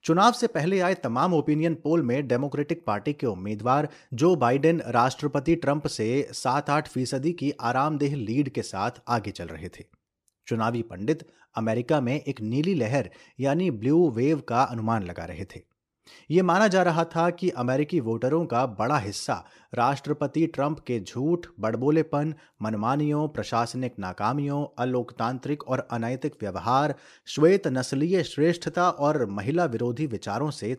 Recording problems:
none

